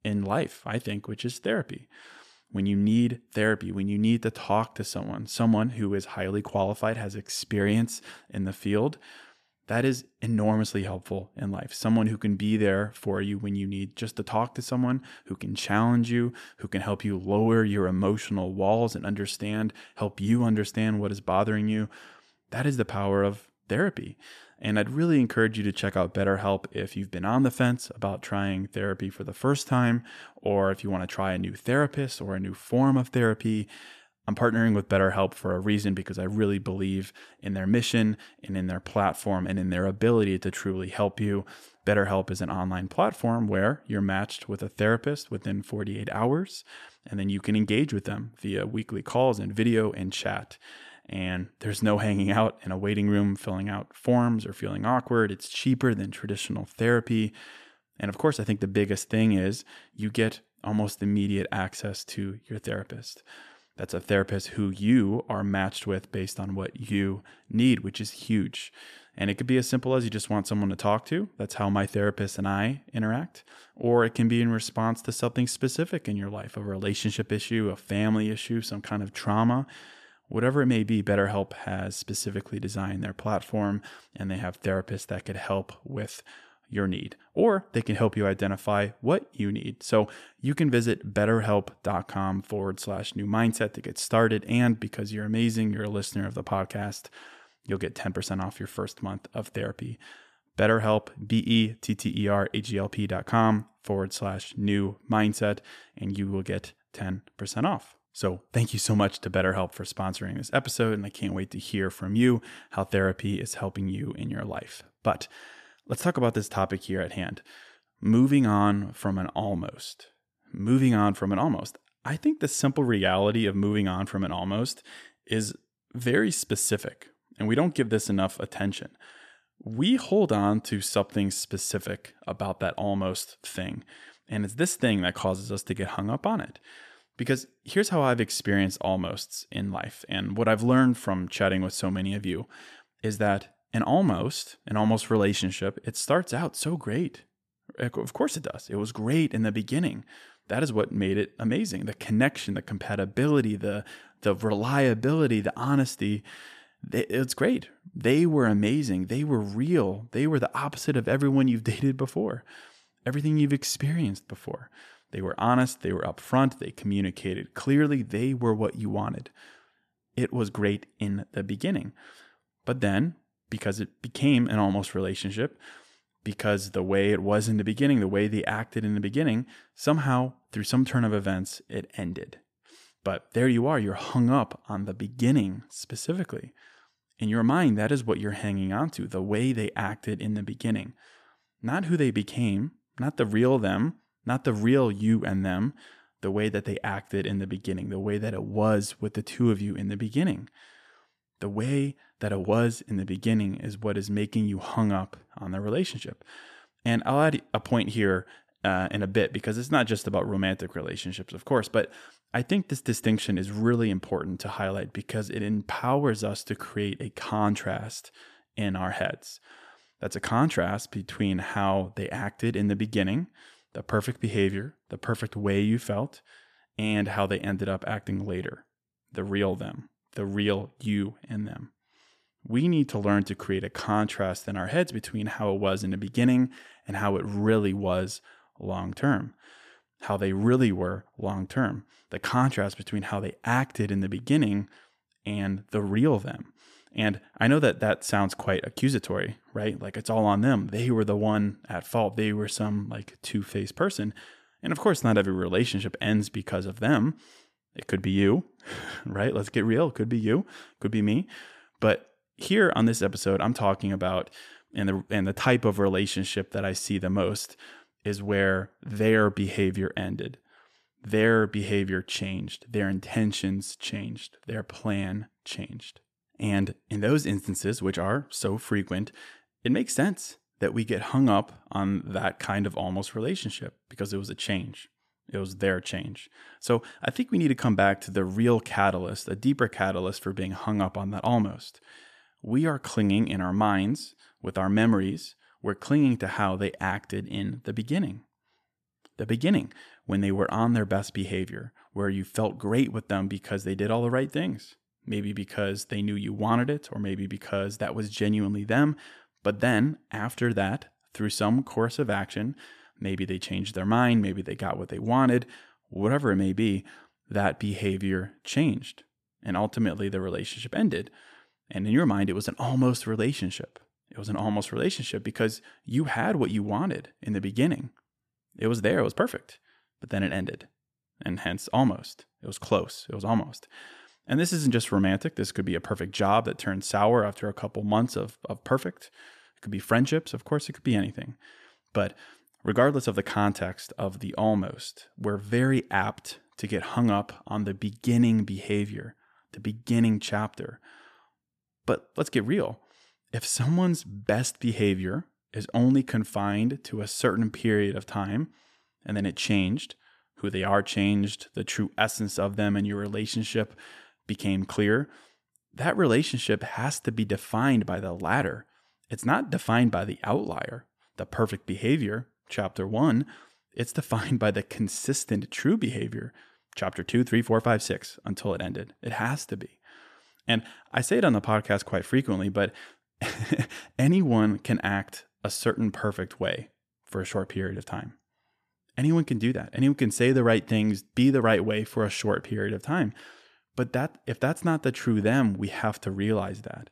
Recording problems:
none

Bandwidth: 14 kHz